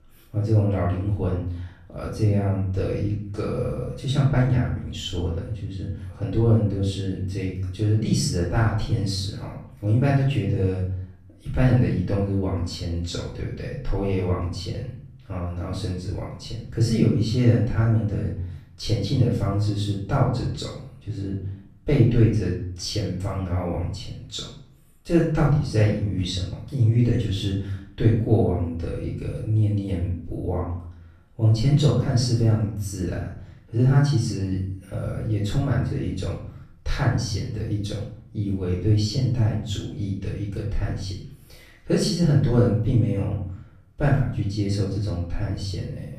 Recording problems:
off-mic speech; far
room echo; noticeable; dies away in 0.6 s

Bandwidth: 14.5 kHz